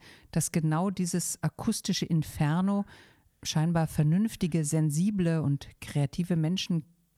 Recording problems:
none

